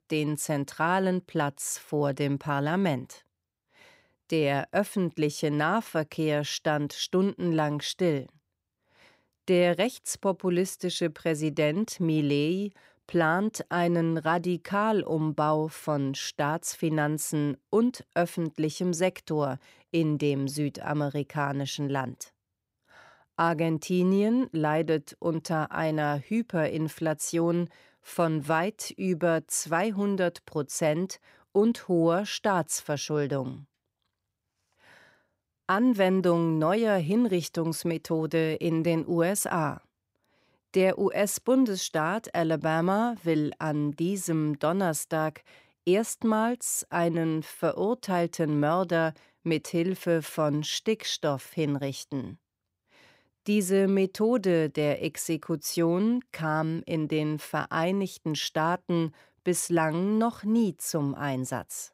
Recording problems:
none

